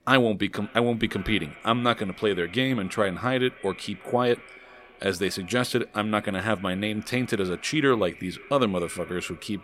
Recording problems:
echo of what is said; faint; throughout; 490 ms later, 20 dB below the speech

